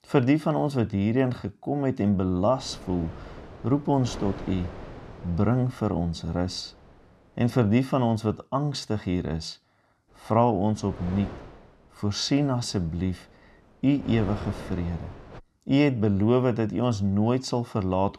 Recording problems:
wind noise on the microphone; occasional gusts; from 2.5 to 8 s and from 10 to 15 s; 15 dB below the speech

